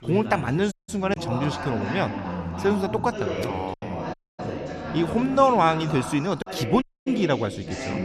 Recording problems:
background chatter; loud; throughout; 3 voices, 7 dB below the speech
choppy; occasionally; 2% of the speech affected
audio cutting out; at 0.5 s, at 4 s and at 7 s

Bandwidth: 13.5 kHz